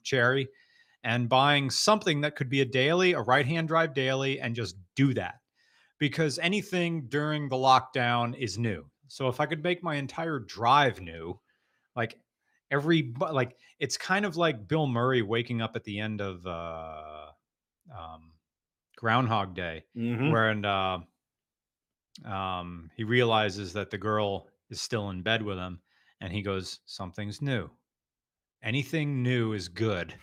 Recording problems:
none

